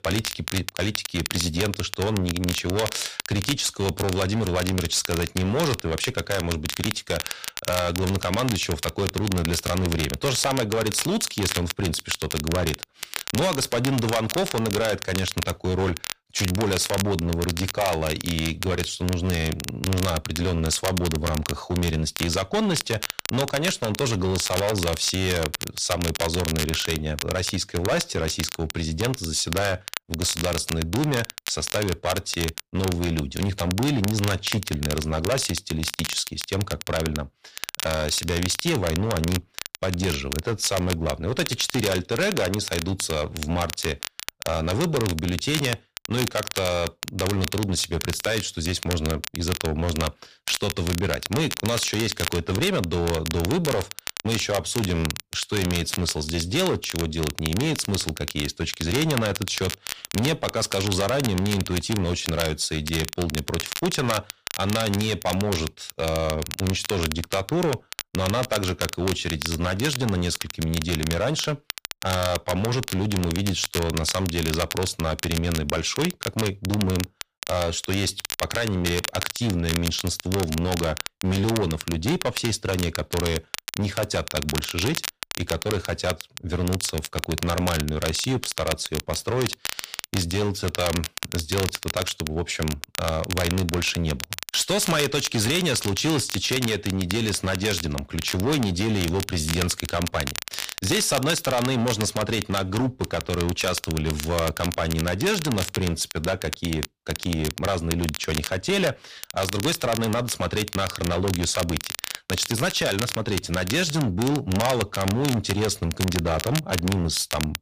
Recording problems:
distortion; heavy; 10% of the sound clipped
crackle, like an old record; loud; 7 dB below the speech

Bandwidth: 15 kHz